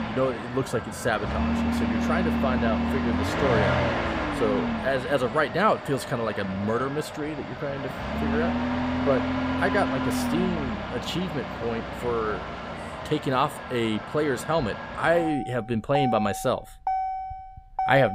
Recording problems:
traffic noise; loud; throughout; 2 dB below the speech
abrupt cut into speech; at the end

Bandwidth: 15.5 kHz